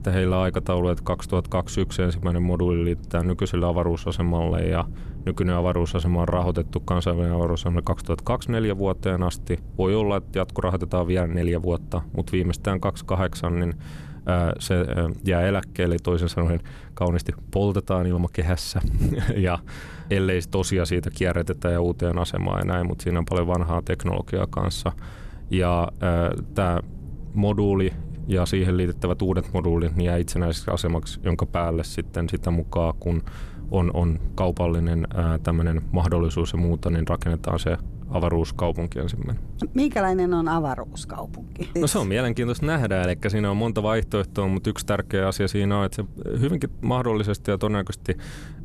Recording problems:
low rumble; faint; throughout; 25 dB below the speech

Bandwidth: 13.5 kHz